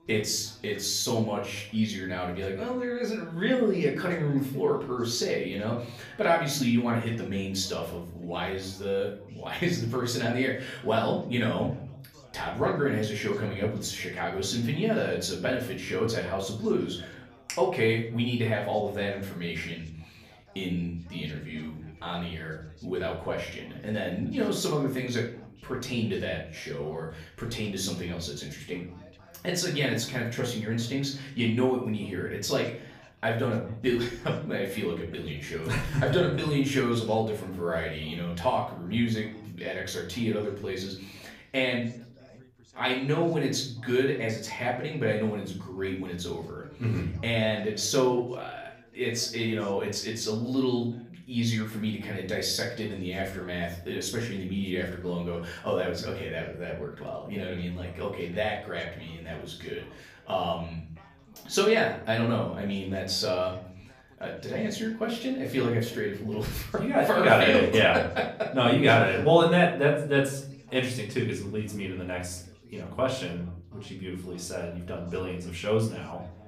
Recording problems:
off-mic speech; far
room echo; slight; dies away in 0.5 s
background chatter; faint; throughout; 2 voices, 25 dB below the speech

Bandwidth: 15 kHz